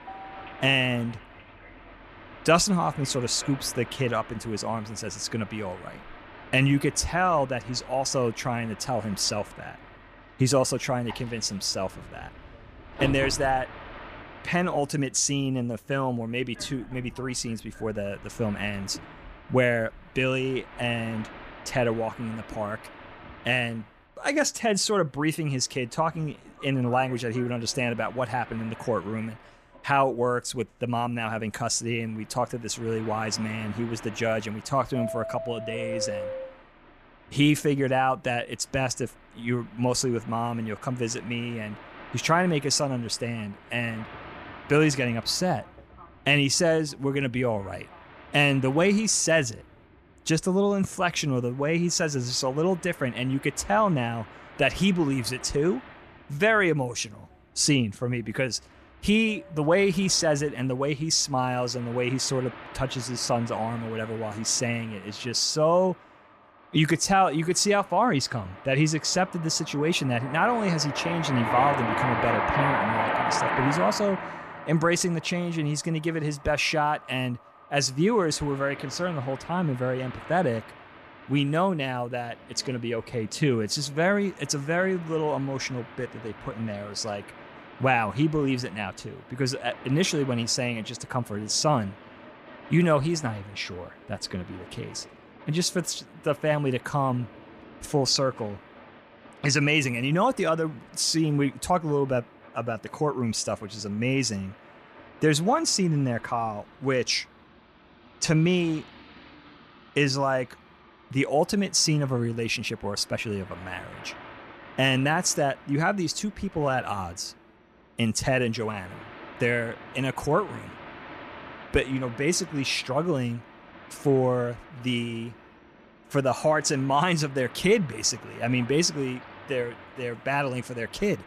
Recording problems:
train or aircraft noise; noticeable; throughout; 15 dB below the speech

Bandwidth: 14.5 kHz